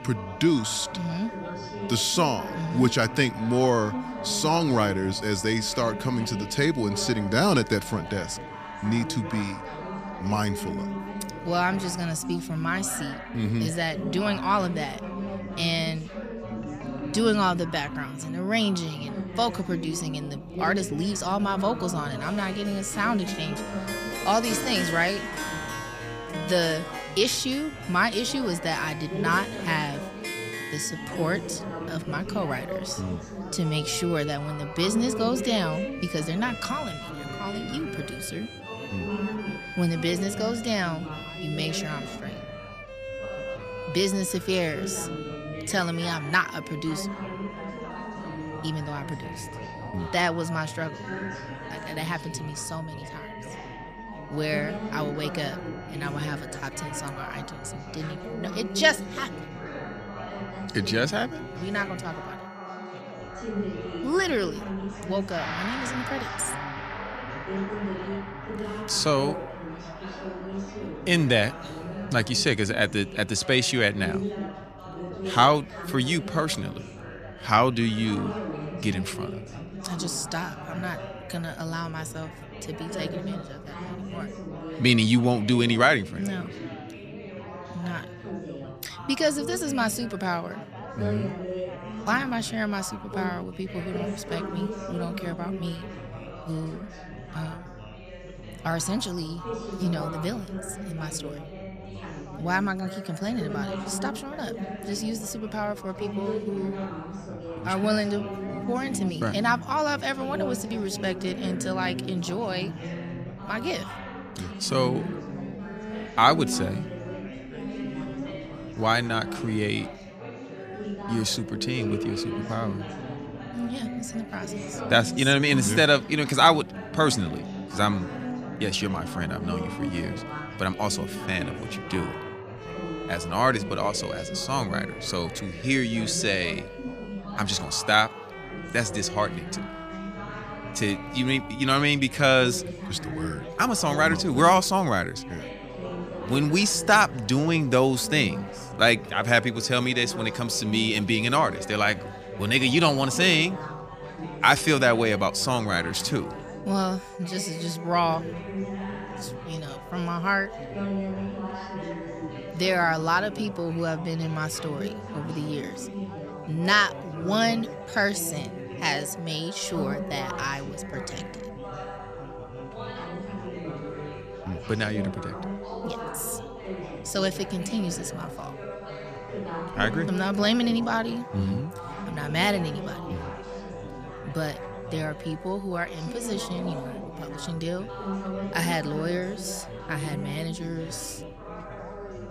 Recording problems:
background music; noticeable; throughout; 15 dB below the speech
background chatter; noticeable; throughout; 4 voices, 10 dB below the speech

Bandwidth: 14.5 kHz